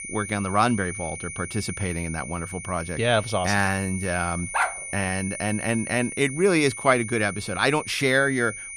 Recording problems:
high-pitched whine; loud; throughout; 9.5 kHz, 9 dB below the speech
dog barking; noticeable; at 4.5 s; peak 1 dB below the speech

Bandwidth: 14.5 kHz